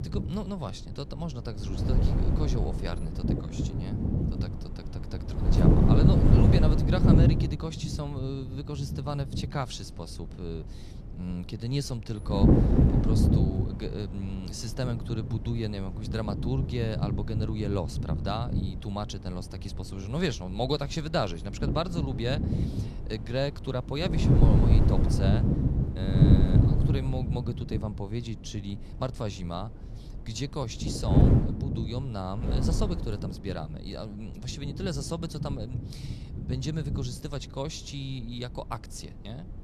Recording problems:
wind noise on the microphone; heavy; 1 dB above the speech

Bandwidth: 13.5 kHz